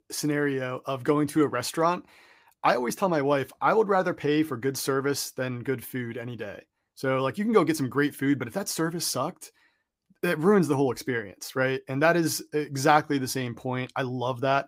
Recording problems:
none

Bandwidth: 15.5 kHz